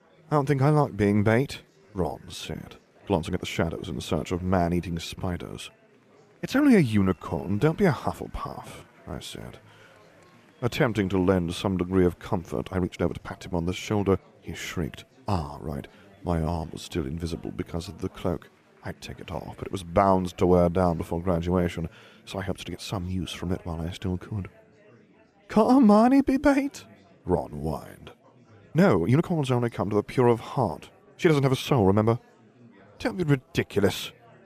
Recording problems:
murmuring crowd; faint; throughout; 30 dB below the speech
uneven, jittery; strongly; from 1.5 to 33 s

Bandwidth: 14.5 kHz